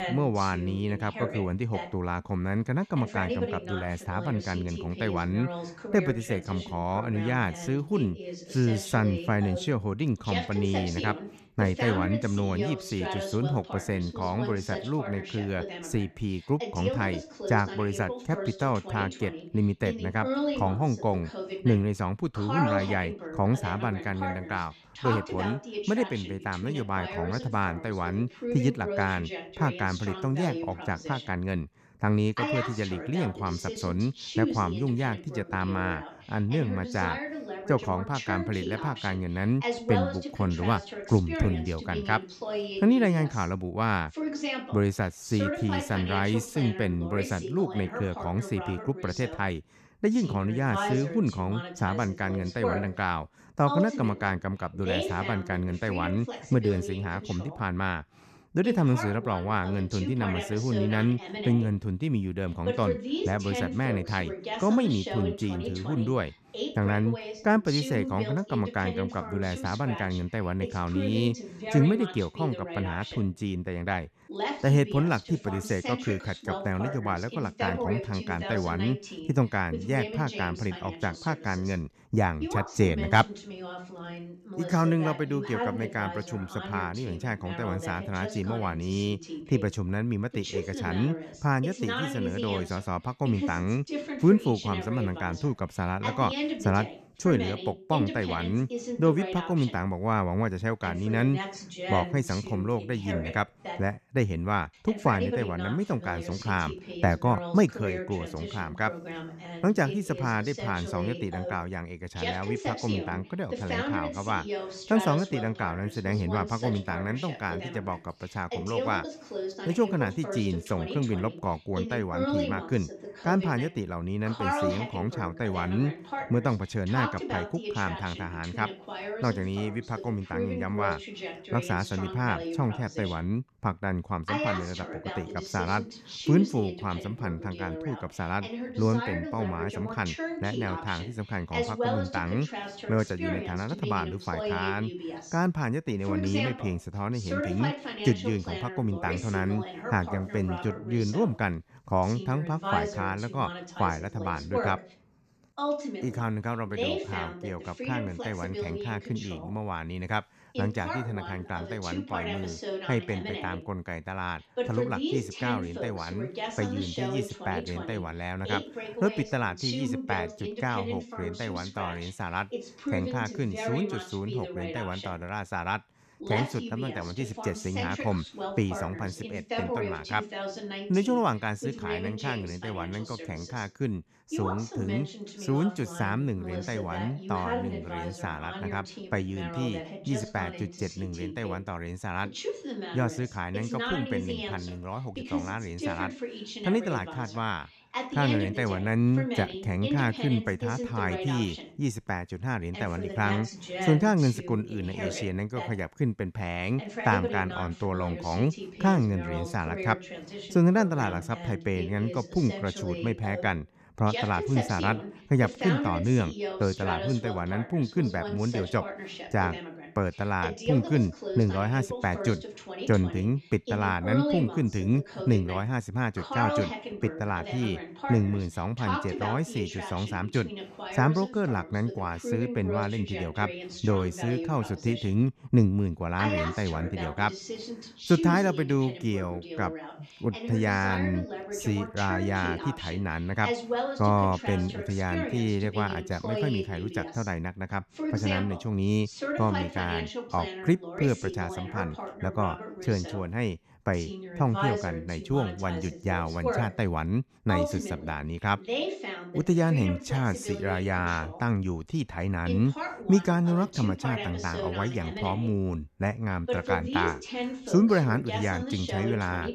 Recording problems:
voice in the background; loud; throughout; 6 dB below the speech

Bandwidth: 13.5 kHz